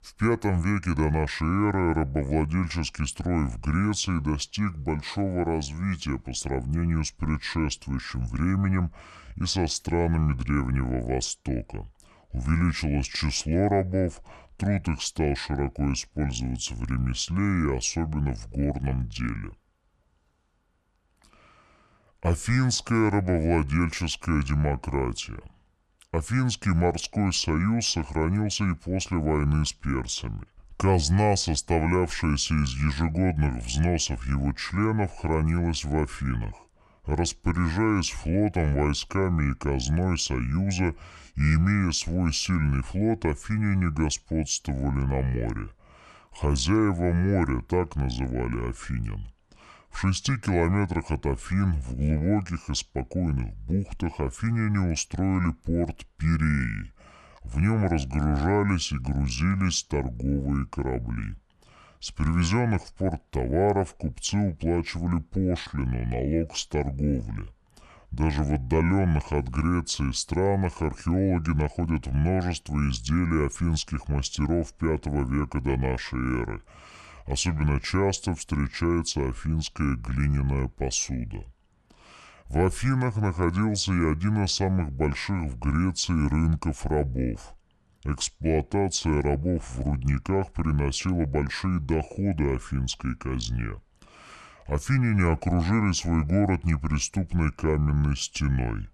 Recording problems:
wrong speed and pitch; too slow and too low; 0.7 times normal speed

